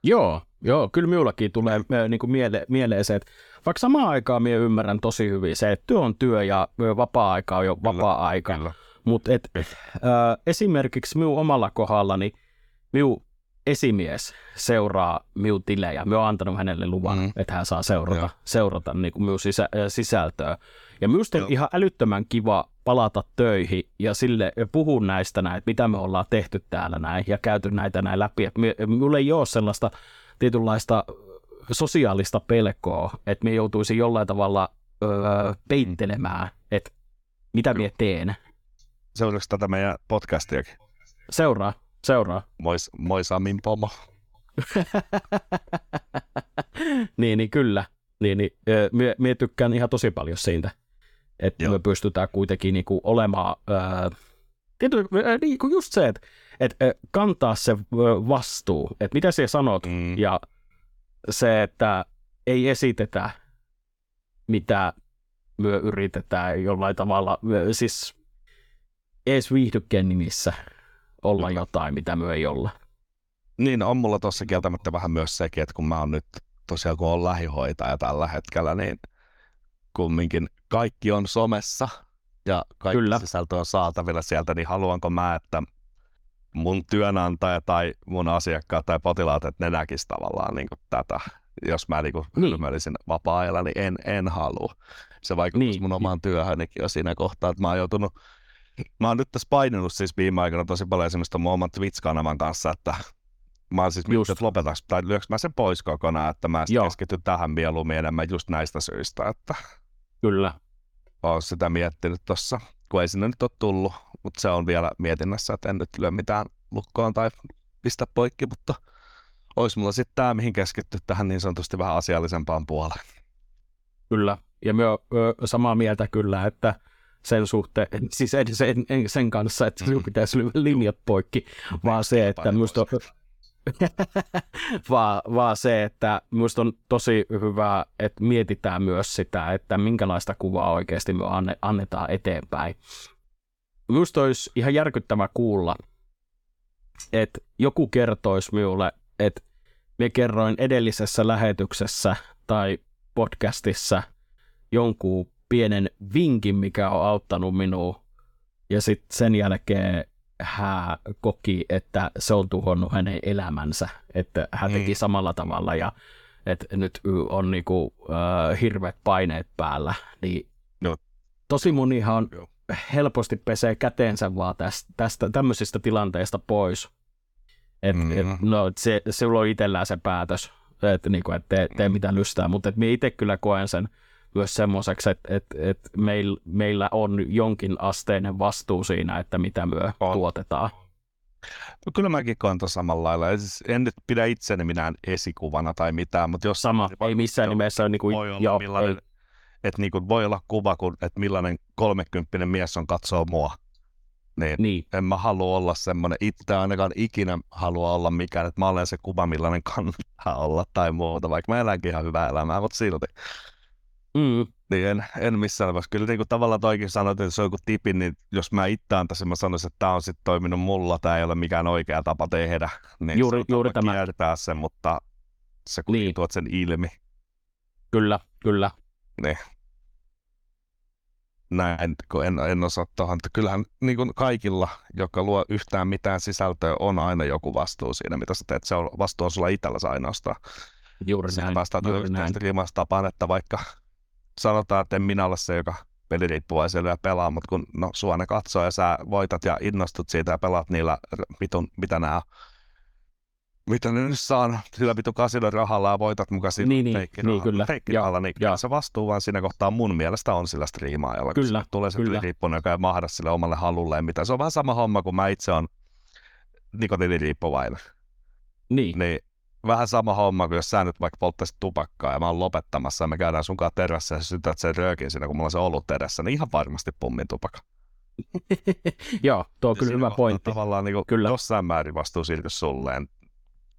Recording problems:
none

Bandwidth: 18 kHz